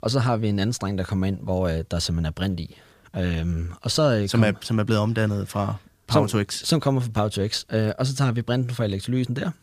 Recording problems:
none

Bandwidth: 15 kHz